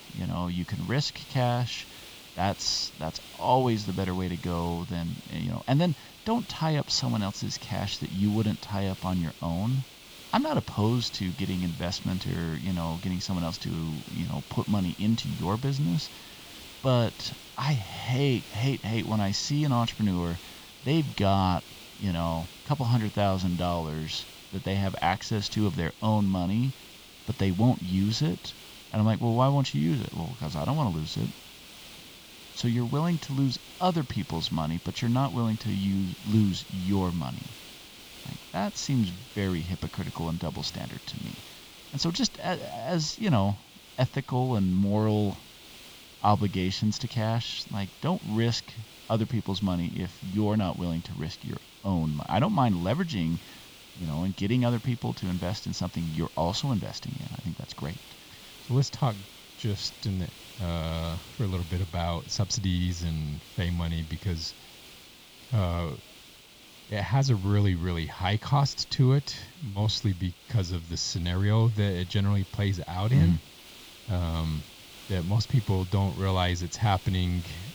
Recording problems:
high frequencies cut off; noticeable; nothing above 7.5 kHz
hiss; noticeable; throughout; 15 dB below the speech

